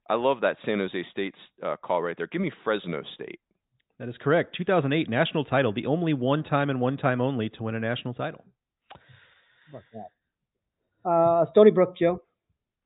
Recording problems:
high frequencies cut off; severe; nothing above 4 kHz

